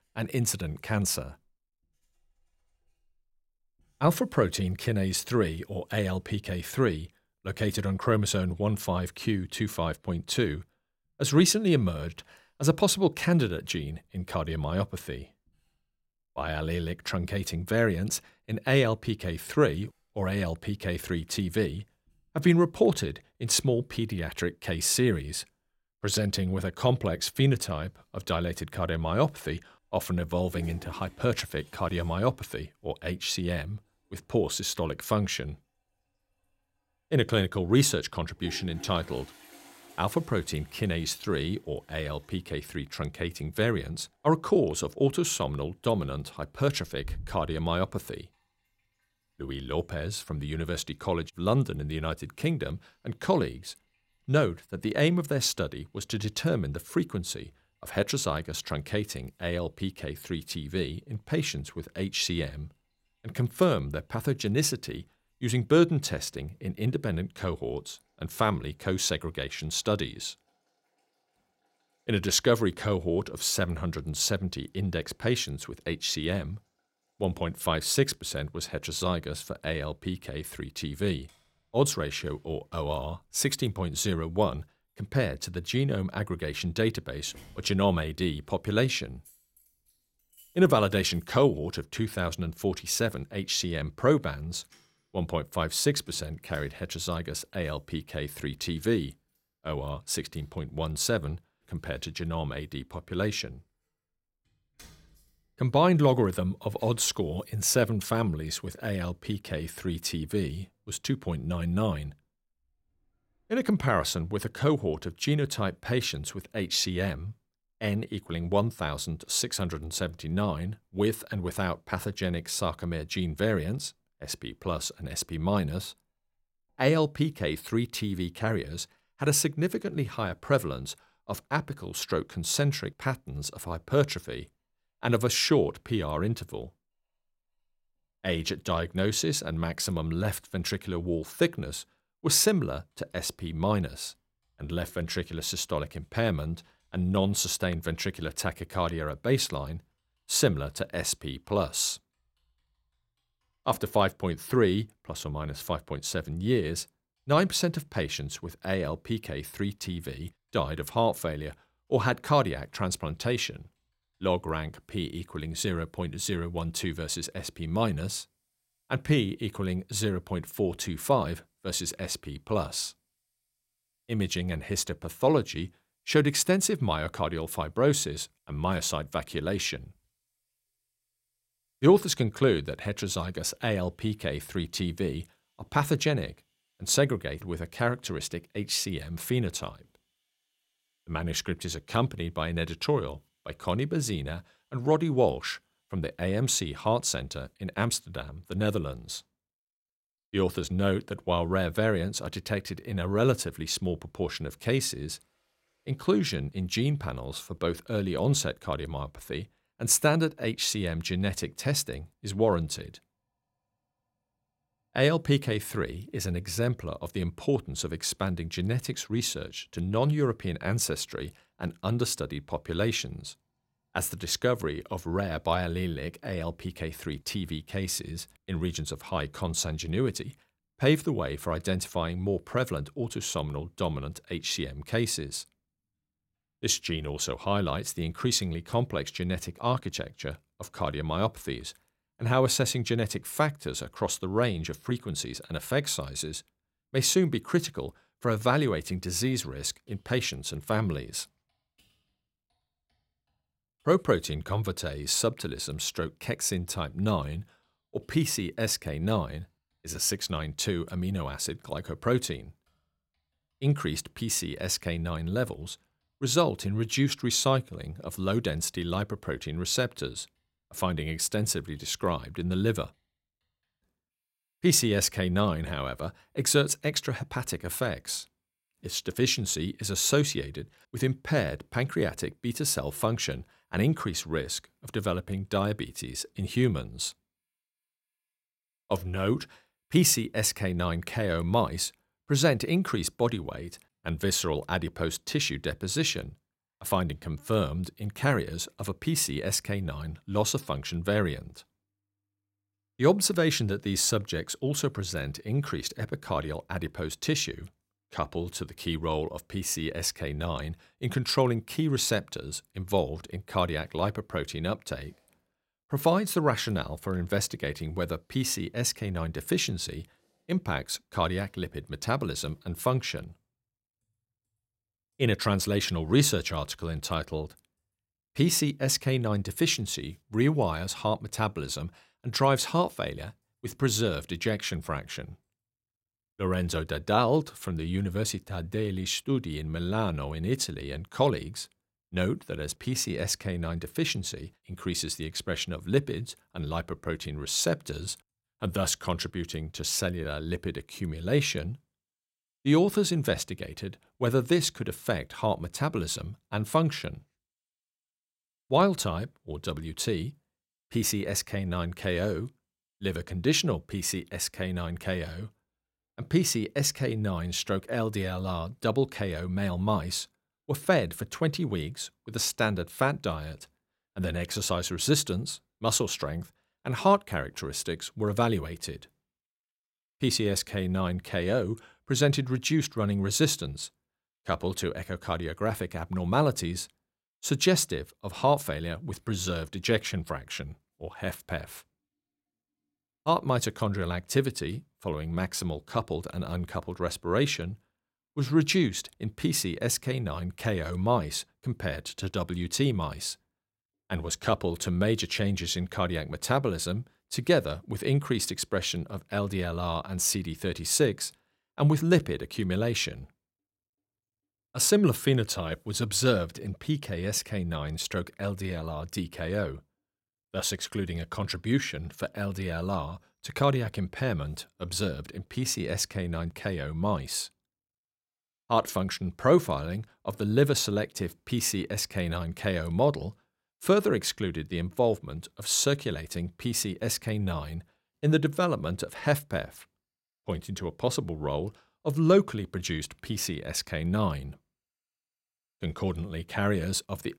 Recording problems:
household noises; faint; throughout; 30 dB below the speech

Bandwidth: 16 kHz